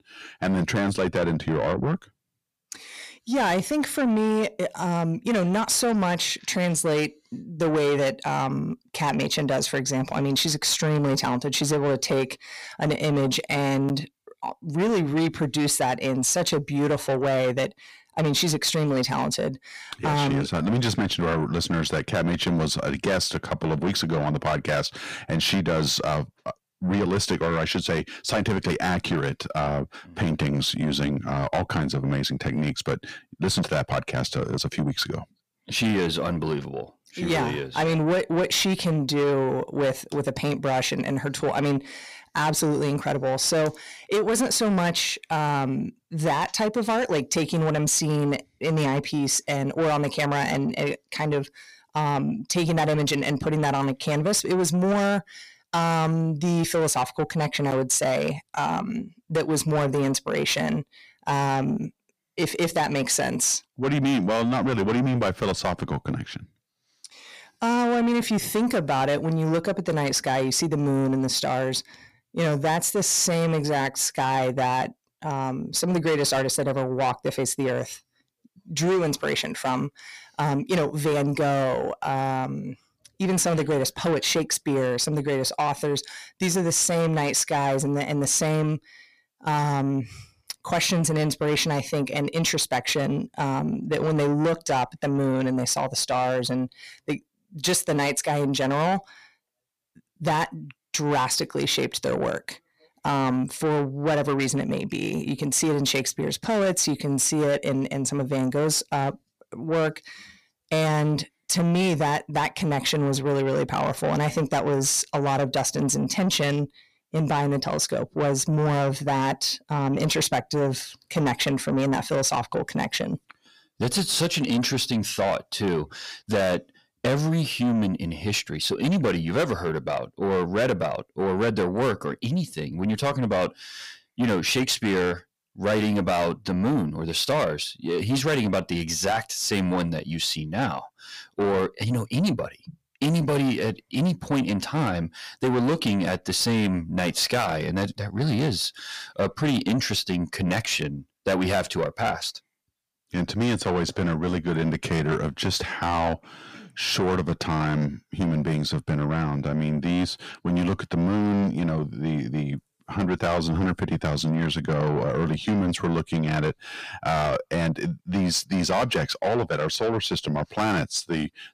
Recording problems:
distortion; heavy; 8 dB below the speech

